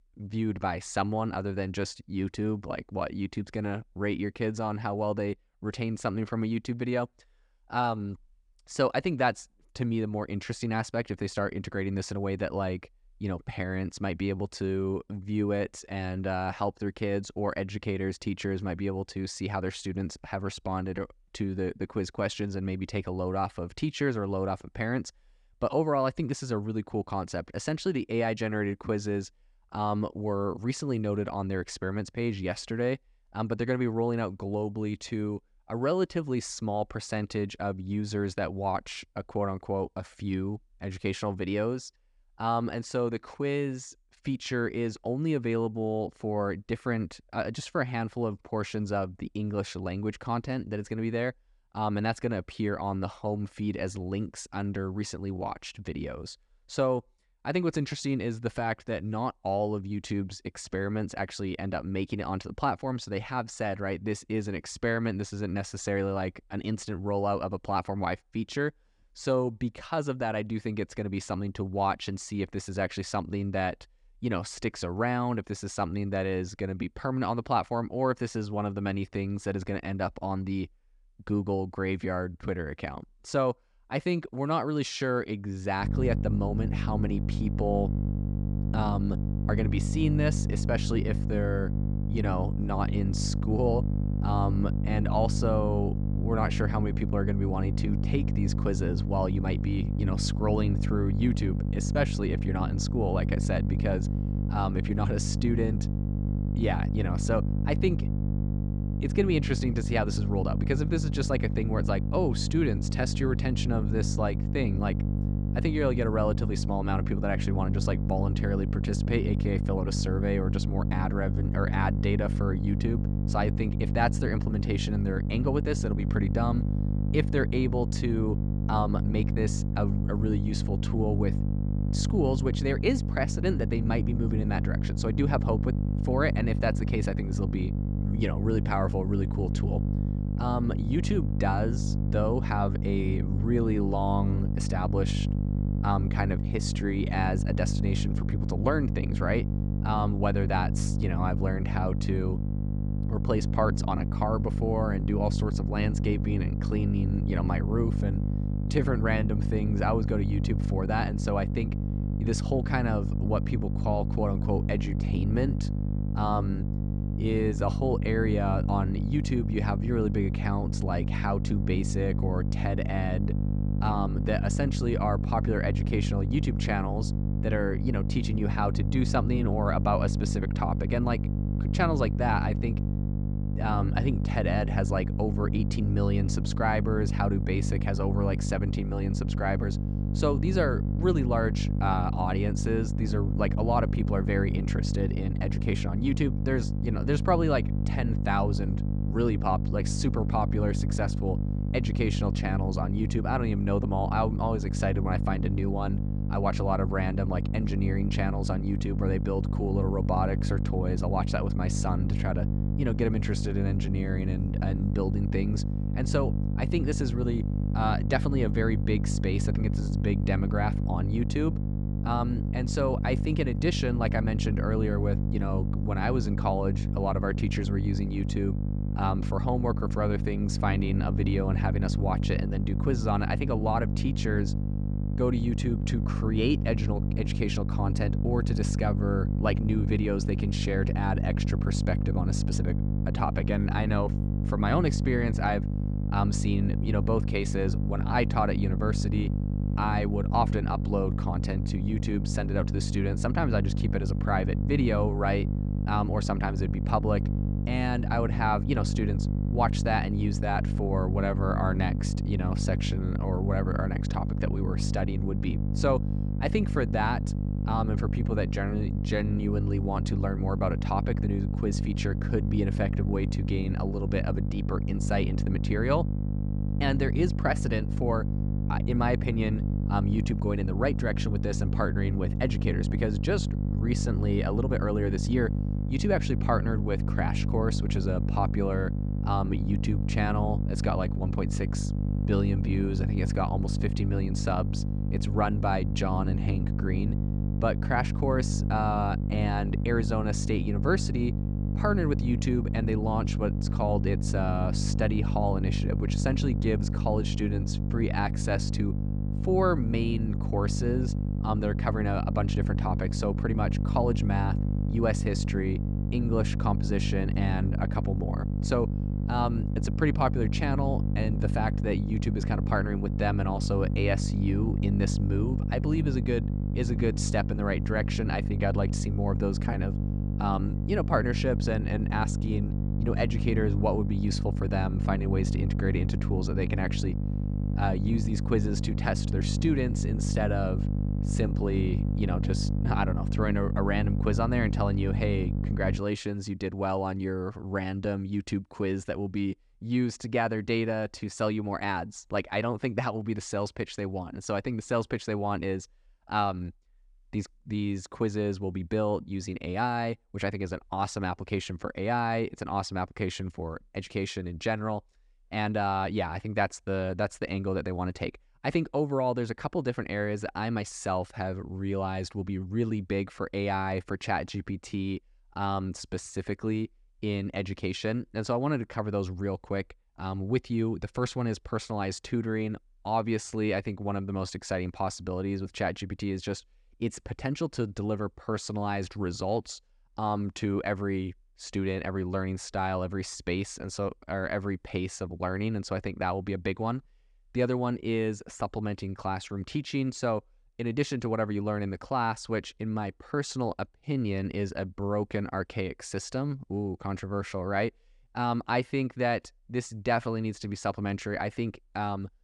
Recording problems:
electrical hum; loud; from 1:26 to 5:46; 50 Hz, 7 dB below the speech

